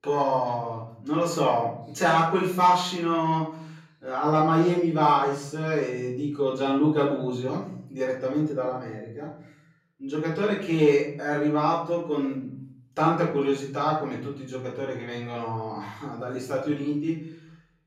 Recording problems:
off-mic speech; far
room echo; noticeable; dies away in 0.7 s

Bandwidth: 16 kHz